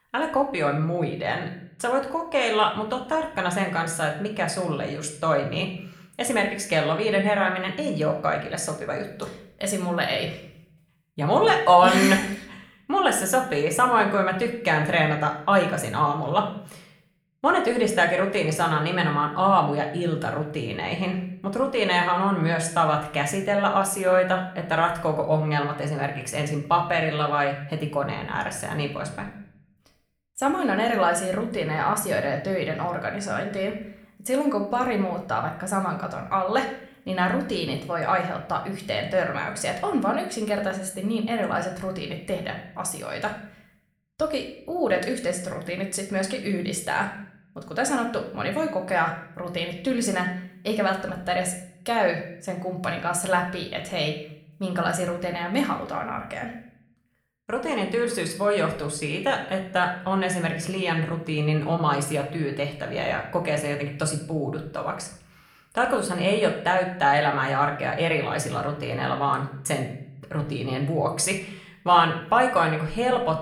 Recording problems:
room echo; slight; dies away in 0.6 s
off-mic speech; somewhat distant

